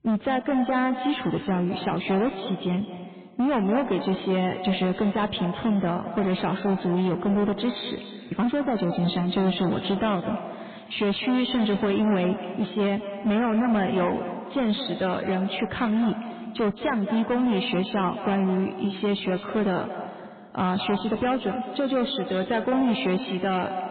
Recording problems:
echo of what is said; strong; throughout; 210 ms later, 10 dB below the speech
garbled, watery; badly
high frequencies cut off; severe; nothing above 4 kHz
distortion; slight; 18% of the sound clipped

